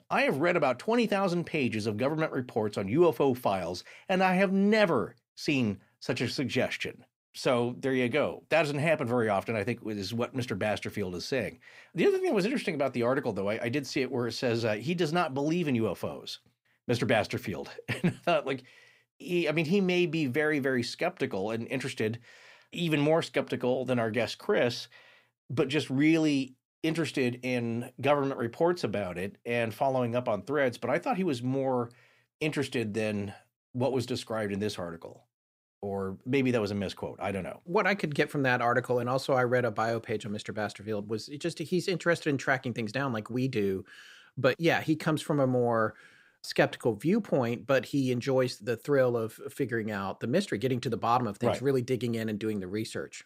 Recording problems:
none

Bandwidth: 15.5 kHz